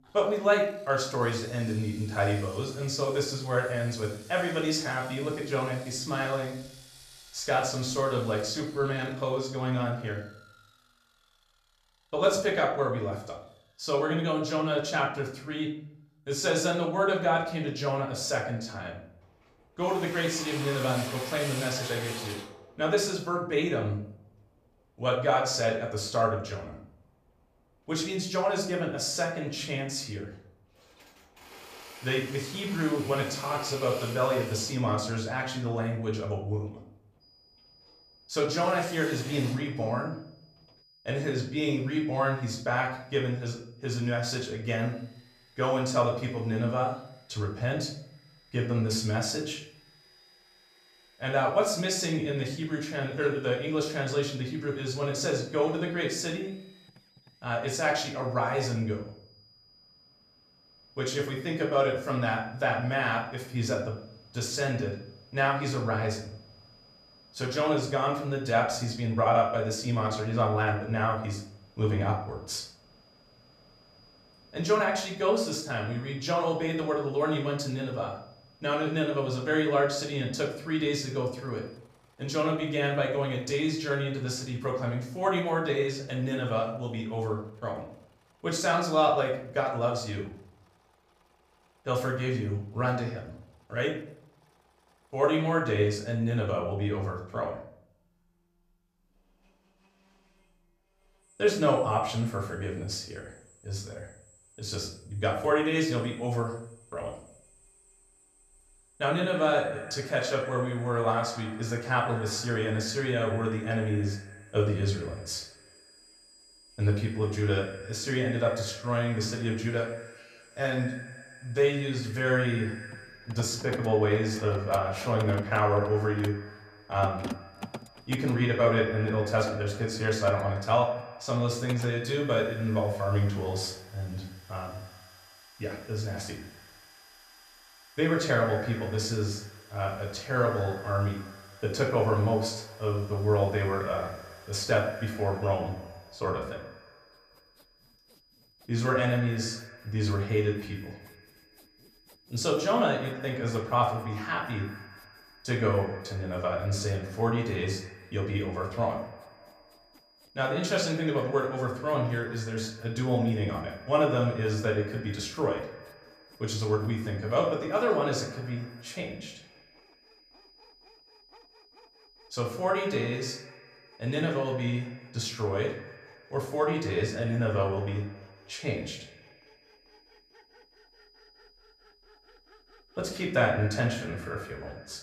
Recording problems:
off-mic speech; far
echo of what is said; noticeable; from 1:49 on; 100 ms later, 15 dB below the speech
room echo; slight; dies away in 0.5 s
machinery noise; noticeable; throughout; 20 dB below the speech
high-pitched whine; faint; from 37 s to 1:22 and from 1:55 on; 5 kHz, 30 dB below the speech

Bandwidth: 14.5 kHz